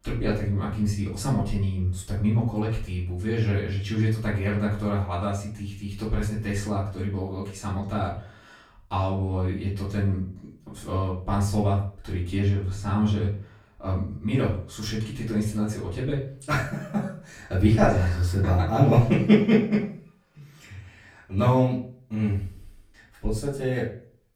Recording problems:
off-mic speech; far
room echo; slight; dies away in 0.4 s

